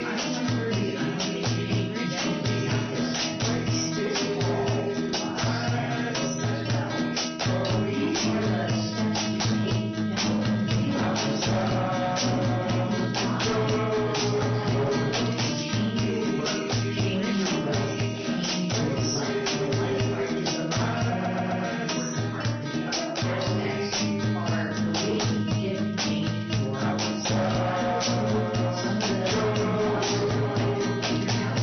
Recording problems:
room echo; strong; dies away in 0.9 s
off-mic speech; far
high frequencies cut off; noticeable; nothing above 6 kHz
distortion; slight; 16% of the sound clipped
garbled, watery; slightly
background music; very loud; throughout; 5 dB above the speech
audio stuttering; at 21 s

